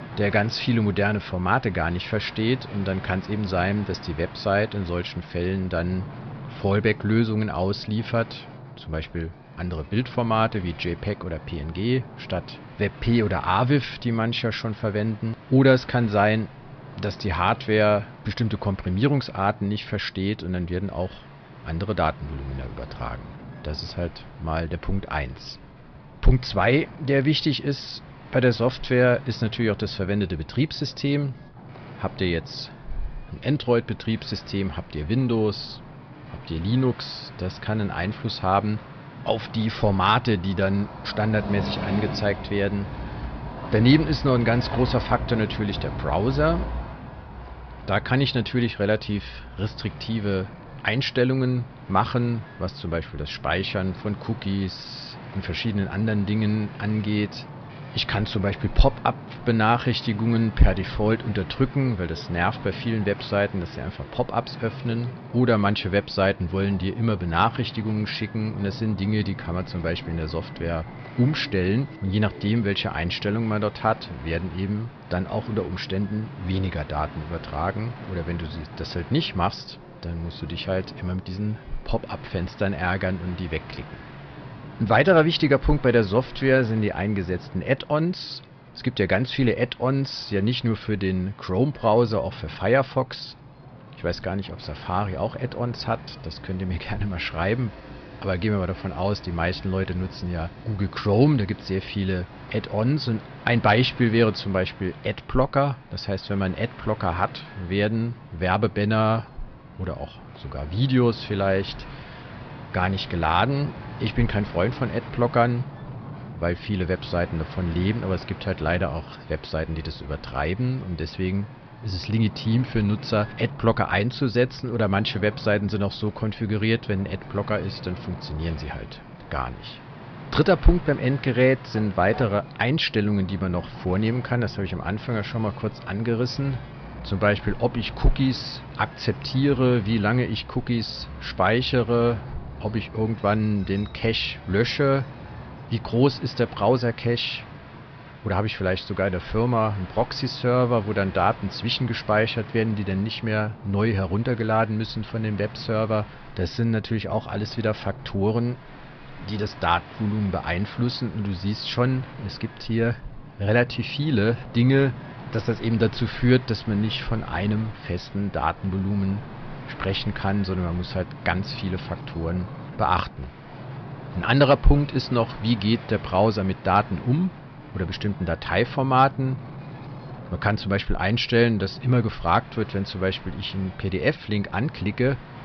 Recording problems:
high frequencies cut off; noticeable; nothing above 5.5 kHz
train or aircraft noise; noticeable; throughout; 20 dB below the speech
wind noise on the microphone; occasional gusts; 20 dB below the speech

